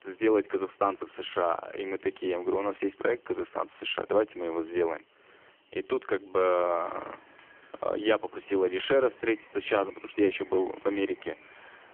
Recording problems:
phone-call audio; poor line; nothing above 3.5 kHz
traffic noise; faint; throughout; 25 dB below the speech

